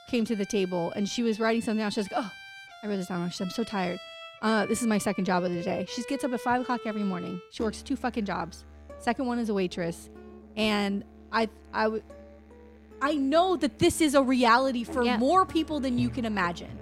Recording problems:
background music; noticeable; throughout; 15 dB below the speech

